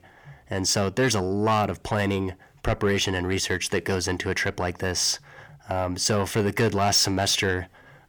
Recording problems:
distortion; slight; 10 dB below the speech

